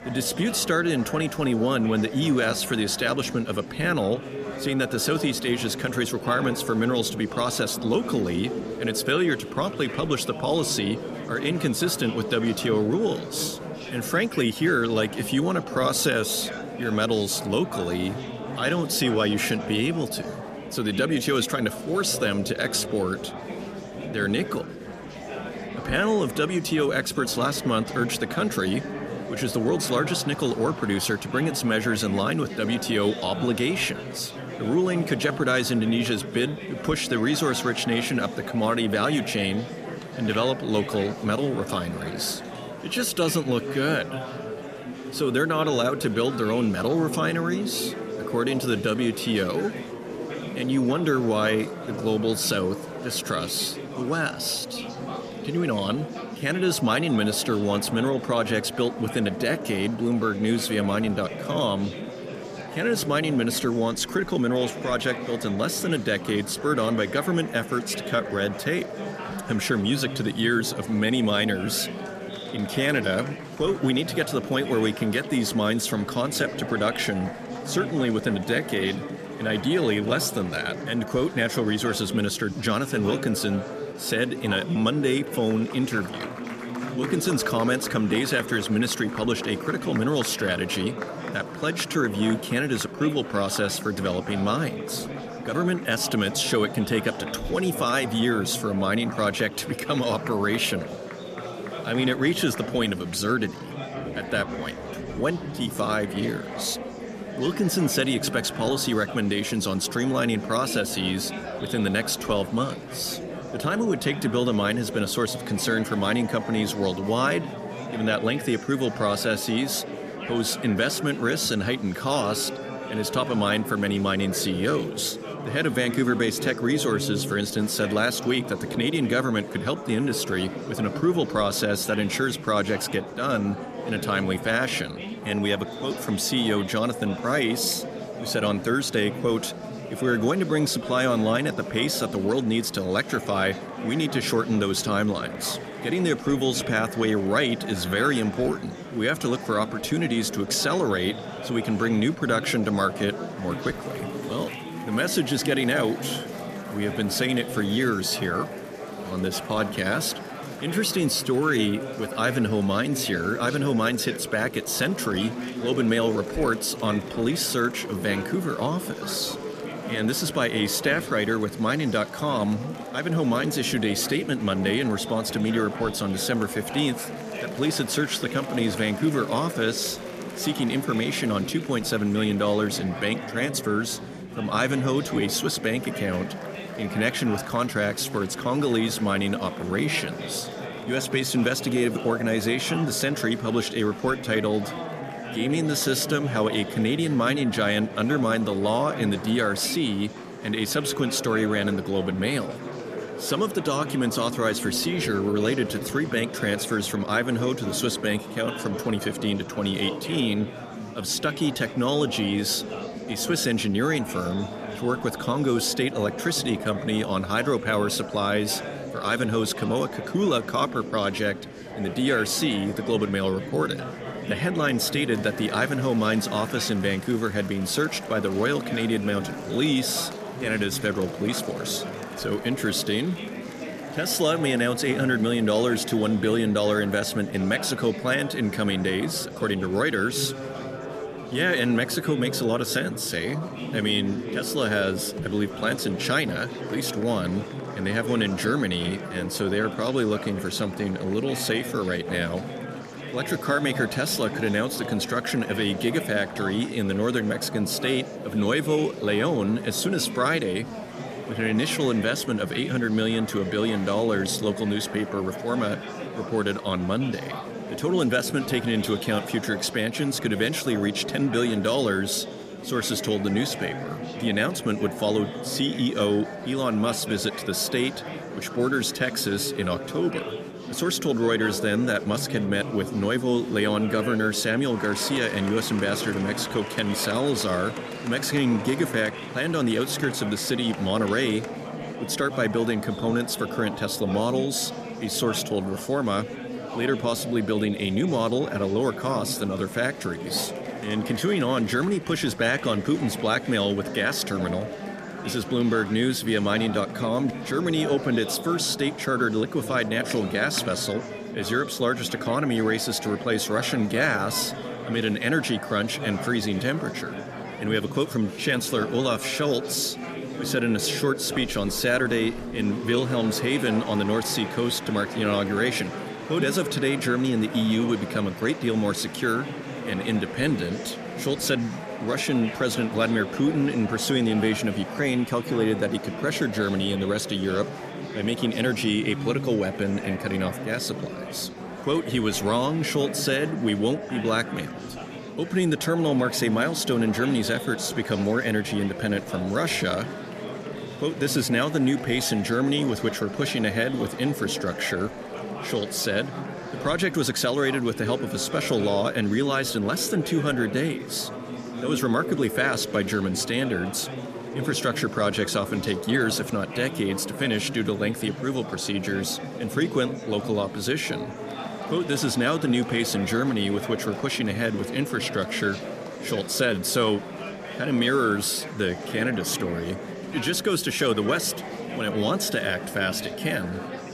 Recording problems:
murmuring crowd; loud; throughout; 9 dB below the speech

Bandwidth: 14.5 kHz